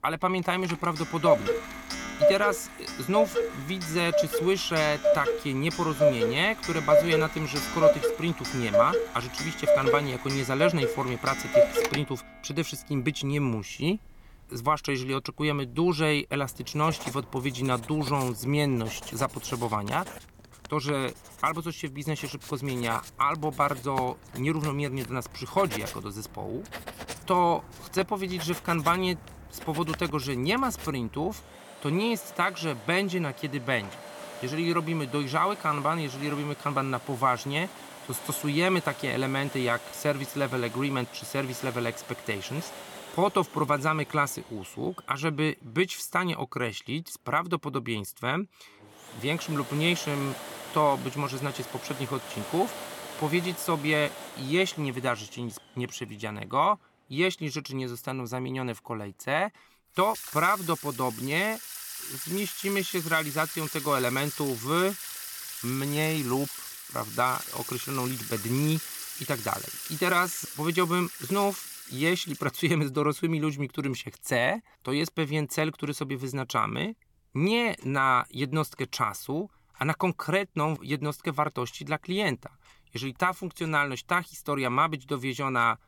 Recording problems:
household noises; loud; throughout; 4 dB below the speech

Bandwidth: 17.5 kHz